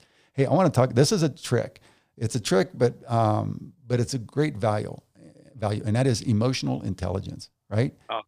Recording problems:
uneven, jittery; slightly; from 2 to 6 s

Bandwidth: 15 kHz